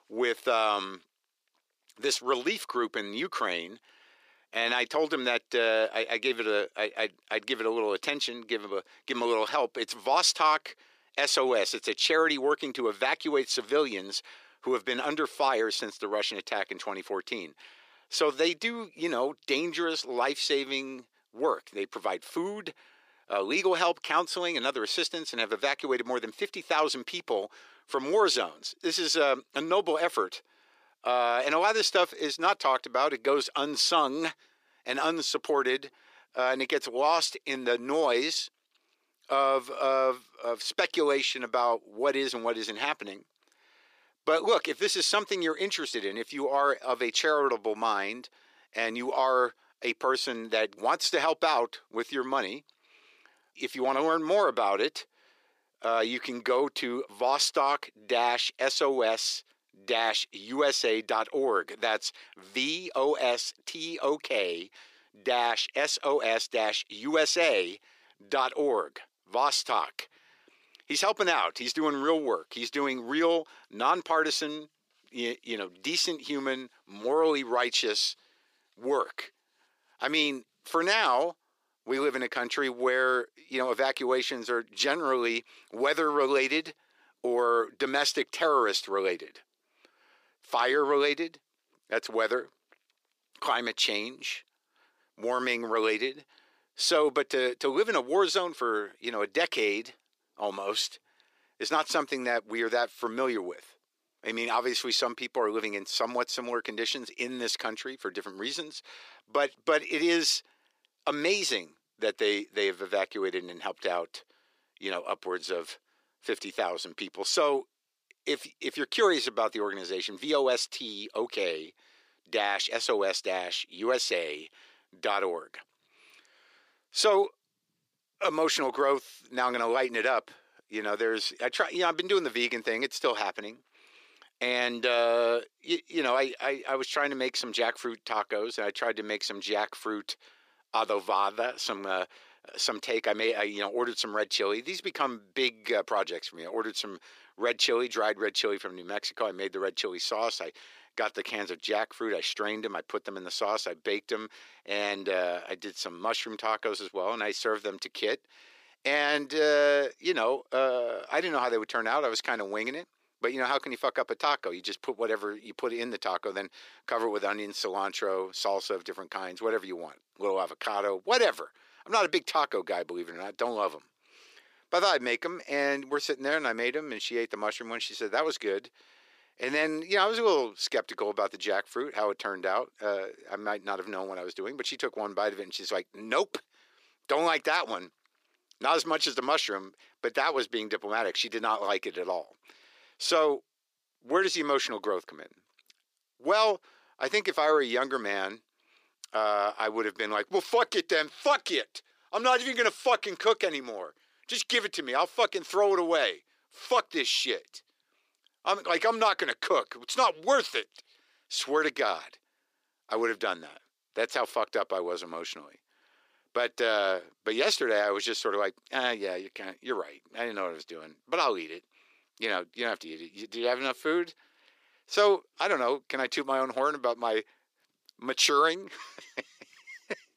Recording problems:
thin; very; fading below 350 Hz

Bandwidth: 15 kHz